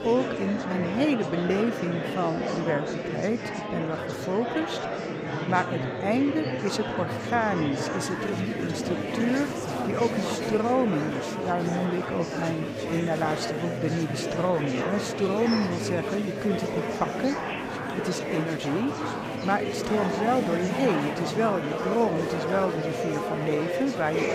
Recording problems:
murmuring crowd; loud; throughout; 2 dB below the speech

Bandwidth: 15.5 kHz